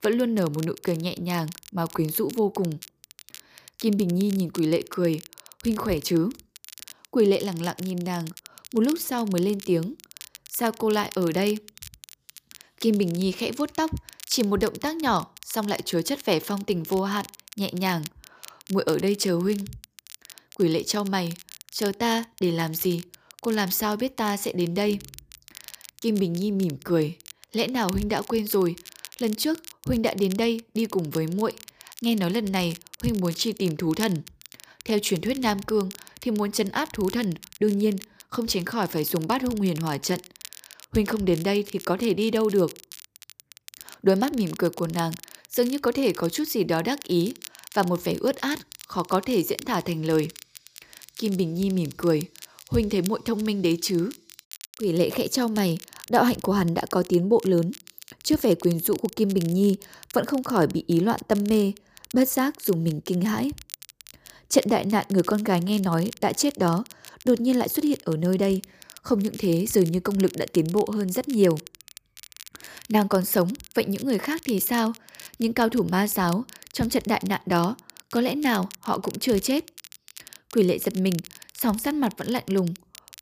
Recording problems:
crackle, like an old record; noticeable; 20 dB below the speech

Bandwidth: 15 kHz